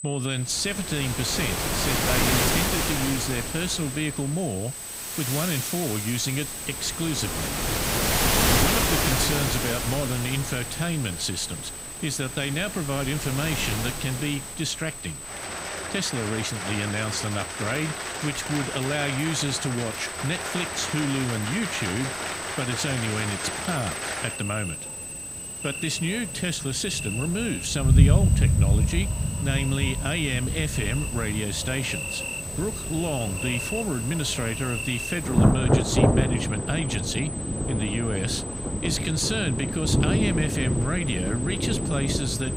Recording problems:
rain or running water; very loud; throughout; 1 dB above the speech
high-pitched whine; loud; throughout; 8 kHz, 7 dB below the speech

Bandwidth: 15.5 kHz